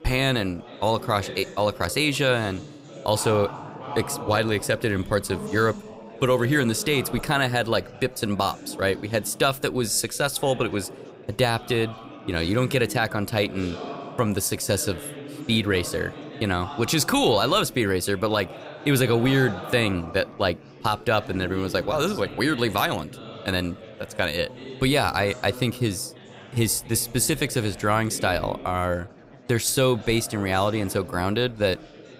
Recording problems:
chatter from many people; noticeable; throughout; 15 dB below the speech

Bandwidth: 15.5 kHz